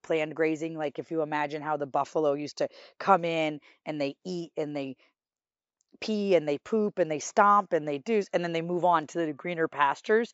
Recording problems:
high frequencies cut off; noticeable; nothing above 8 kHz

